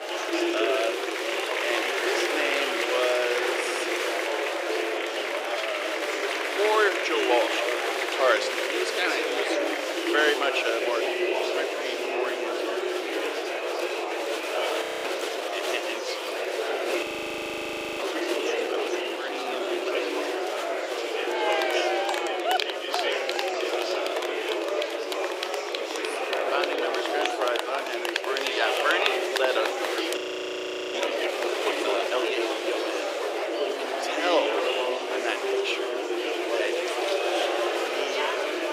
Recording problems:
thin; very; fading below 350 Hz
murmuring crowd; very loud; throughout; 3 dB above the speech
audio freezing; at 15 s, at 17 s for 1 s and at 30 s for 1 s

